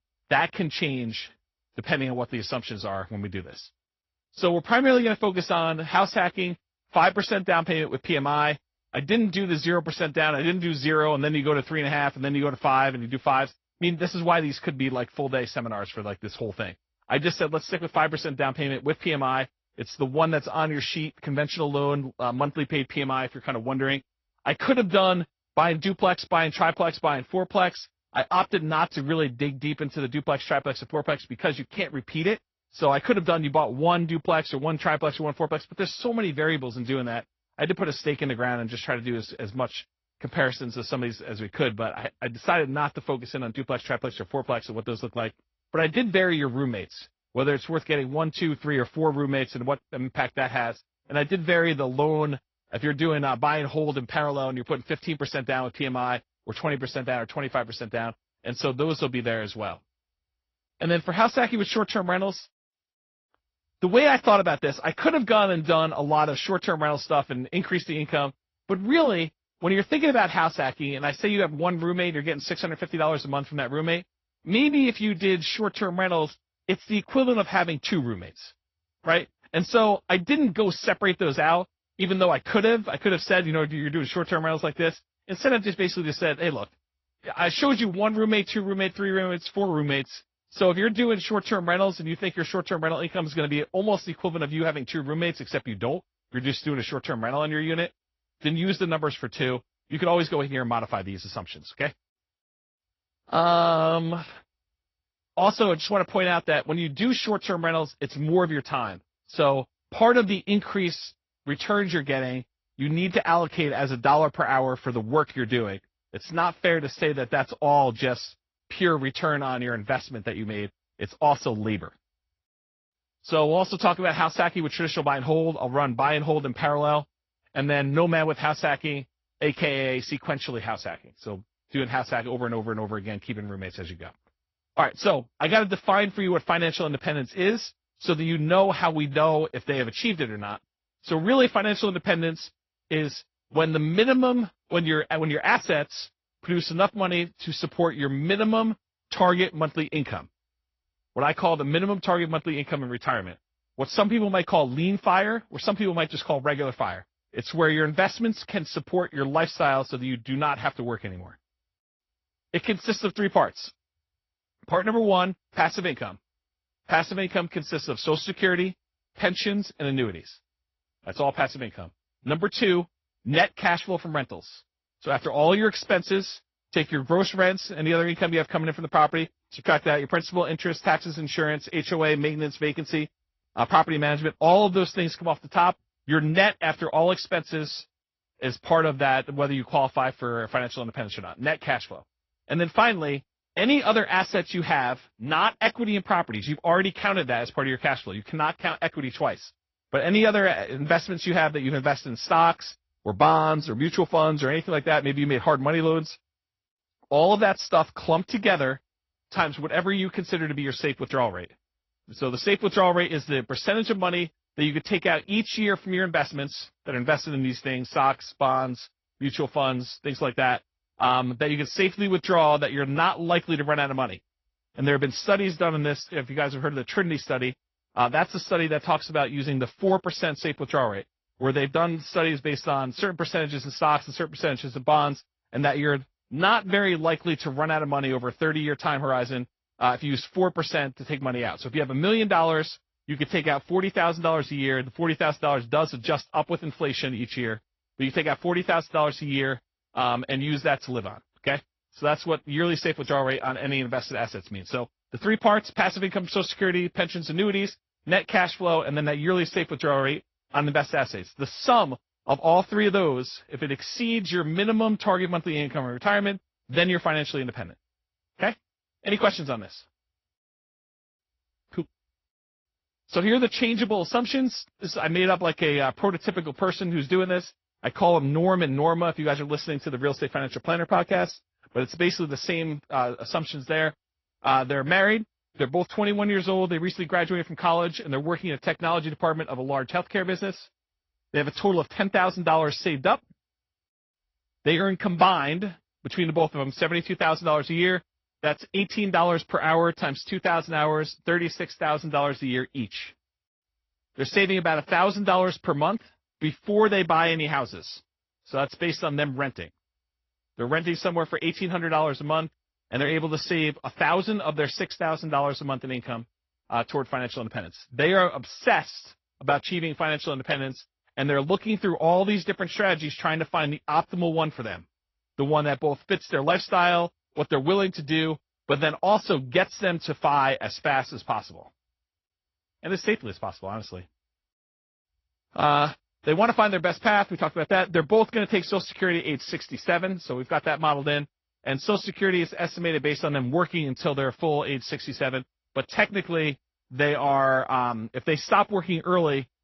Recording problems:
high frequencies cut off; noticeable; nothing above 5.5 kHz
garbled, watery; slightly

